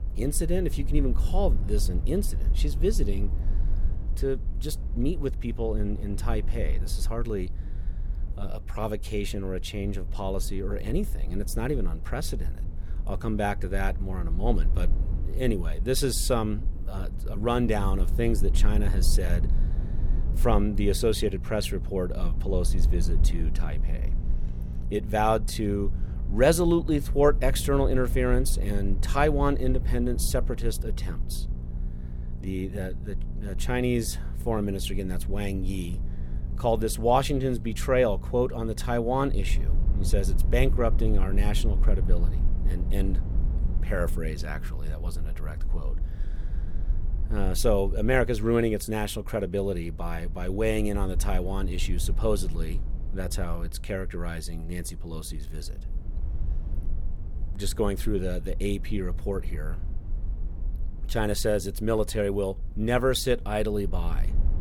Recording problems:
low rumble; noticeable; throughout; 20 dB below the speech
electrical hum; faint; from 17 to 45 s; 60 Hz, 20 dB below the speech

